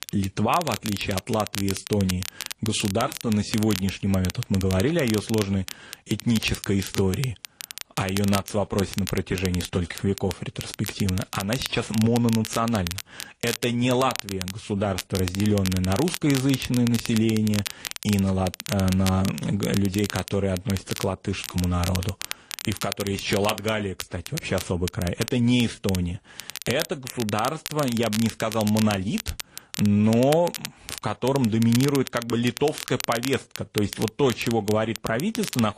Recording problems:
garbled, watery; slightly; nothing above 10 kHz
crackle, like an old record; loud; 9 dB below the speech

